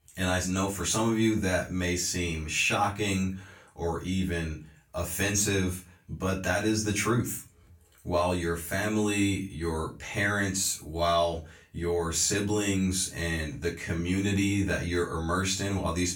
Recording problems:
off-mic speech; far
room echo; very slight; dies away in 0.3 s

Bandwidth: 17 kHz